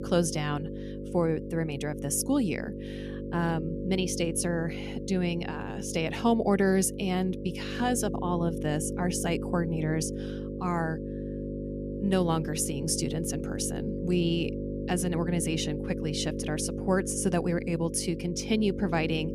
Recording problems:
electrical hum; loud; throughout; 50 Hz, 8 dB below the speech

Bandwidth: 14.5 kHz